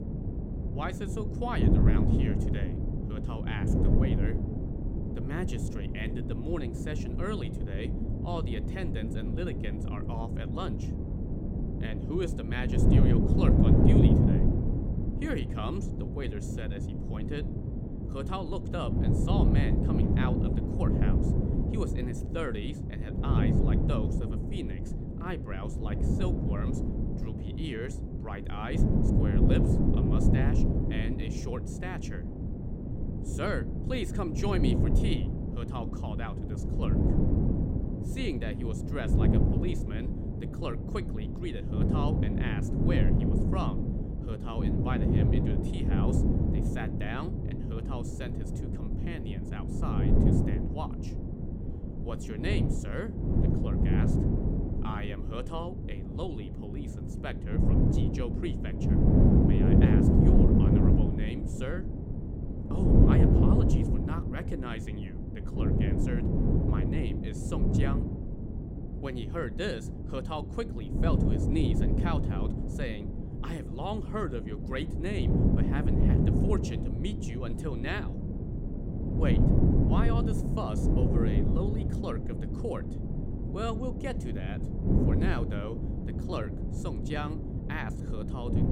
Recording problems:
wind noise on the microphone; heavy; 2 dB above the speech

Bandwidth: 16 kHz